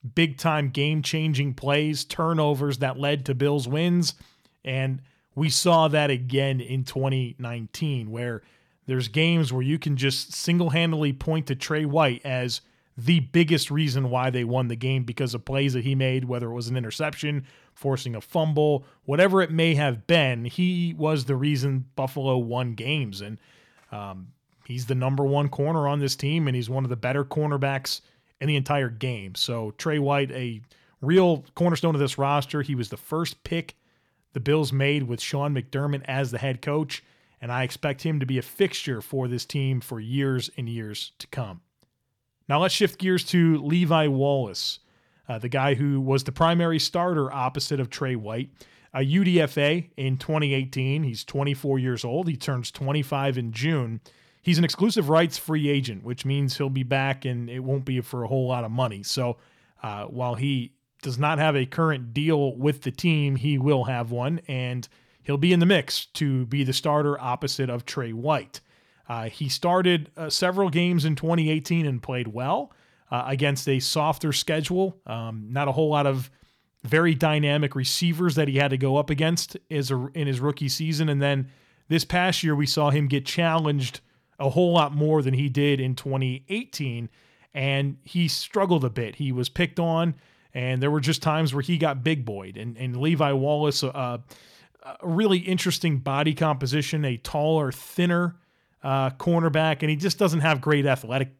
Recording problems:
uneven, jittery; strongly; from 5.5 s to 1:40

